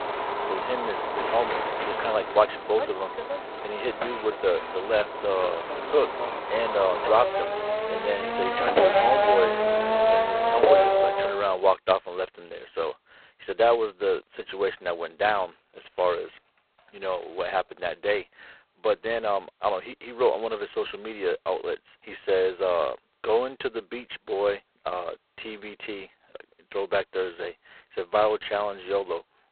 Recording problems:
phone-call audio; poor line; nothing above 4 kHz
traffic noise; very loud; until 11 s; 2 dB above the speech

